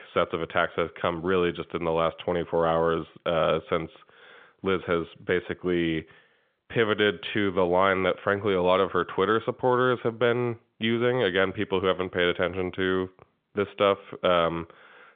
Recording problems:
phone-call audio; nothing above 3.5 kHz

